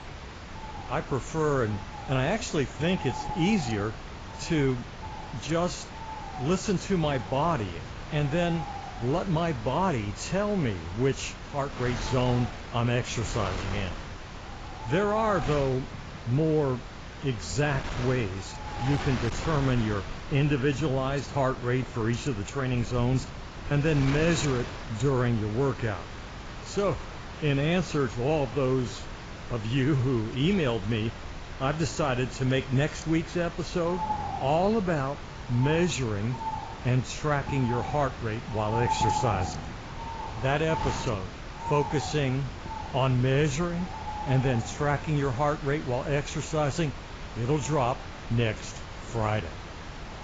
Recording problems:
garbled, watery; badly; nothing above 7.5 kHz
animal sounds; noticeable; throughout; 10 dB below the speech
wind noise on the microphone; occasional gusts; 10 dB below the speech

